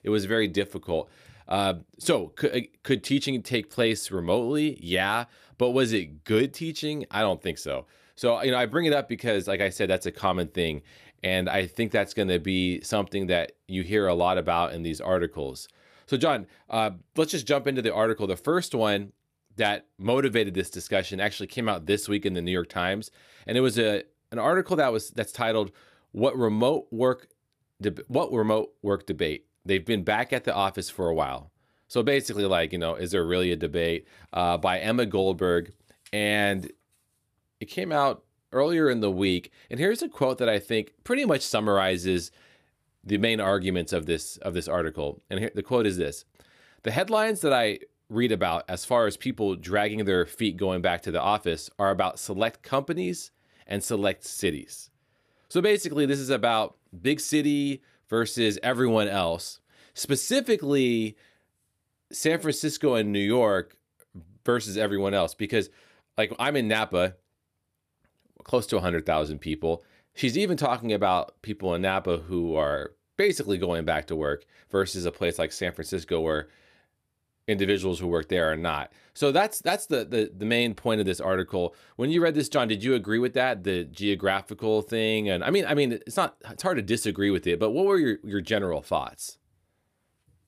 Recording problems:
none

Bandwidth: 14.5 kHz